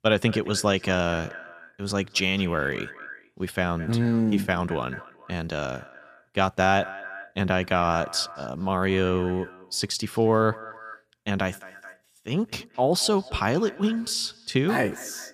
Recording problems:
echo of what is said; noticeable; throughout; 220 ms later, 15 dB below the speech

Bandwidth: 15 kHz